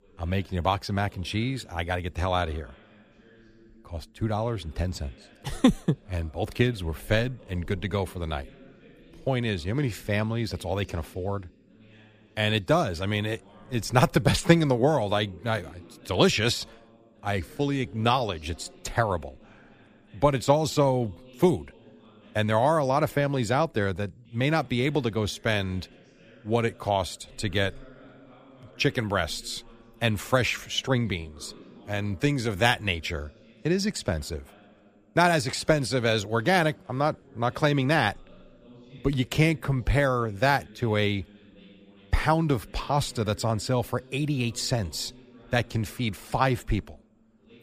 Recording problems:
voice in the background; faint; throughout; 25 dB below the speech

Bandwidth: 15 kHz